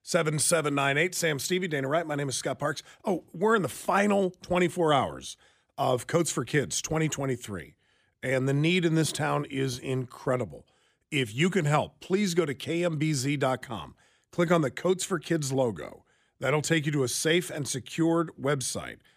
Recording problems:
none

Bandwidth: 15 kHz